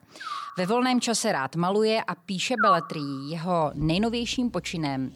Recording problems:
animal sounds; loud; throughout; 3 dB below the speech

